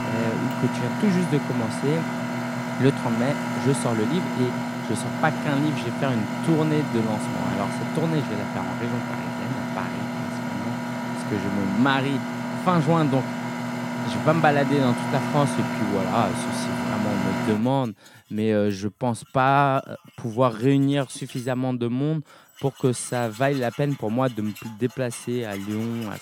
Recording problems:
machinery noise; loud; throughout; 3 dB below the speech

